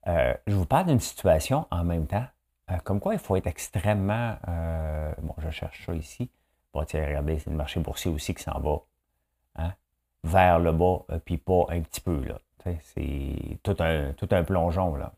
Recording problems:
none

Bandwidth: 15 kHz